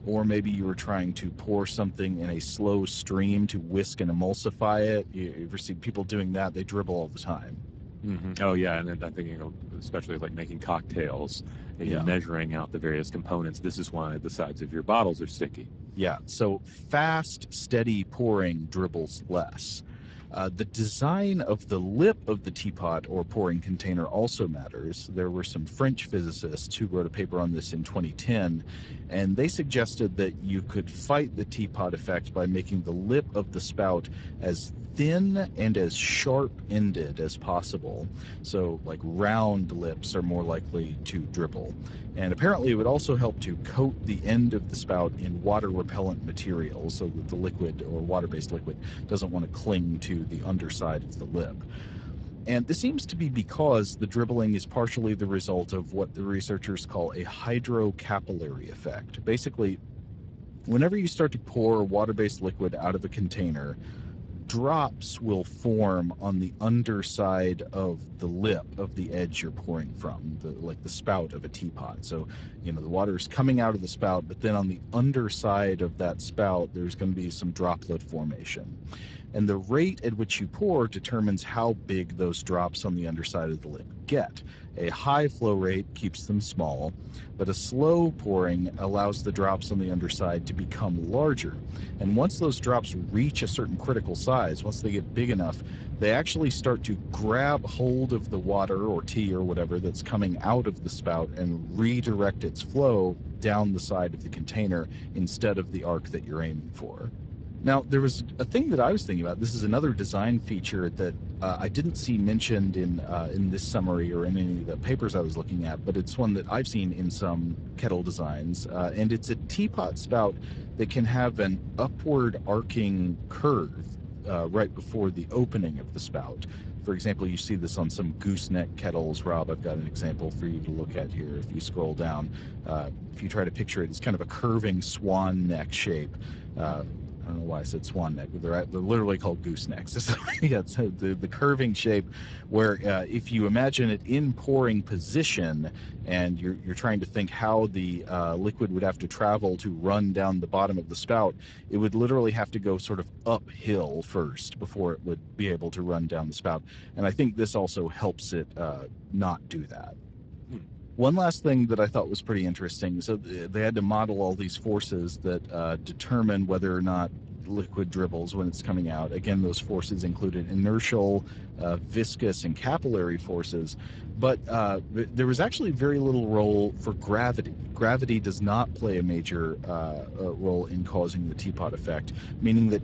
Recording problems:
garbled, watery; badly; nothing above 8 kHz
low rumble; faint; throughout; 20 dB below the speech
uneven, jittery; strongly; from 3 s to 2:48

